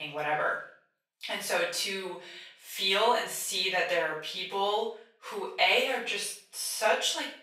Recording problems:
off-mic speech; far
thin; very; fading below 800 Hz
room echo; noticeable; dies away in 0.4 s
abrupt cut into speech; at the start

